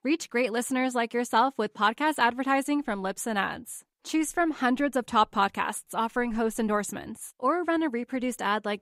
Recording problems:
none

